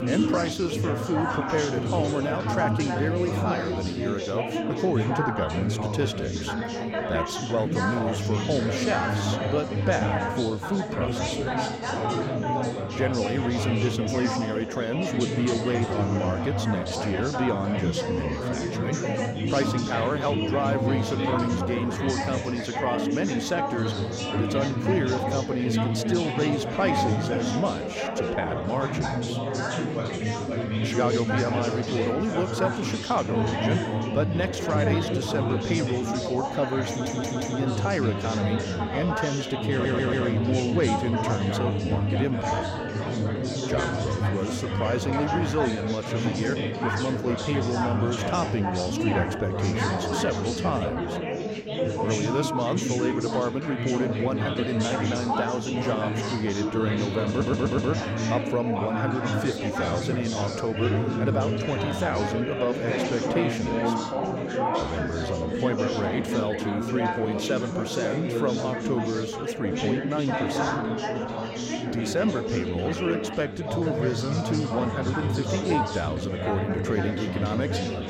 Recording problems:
chatter from many people; very loud; throughout; 1 dB above the speech
audio stuttering; at 37 s, at 40 s and at 57 s

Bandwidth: 16 kHz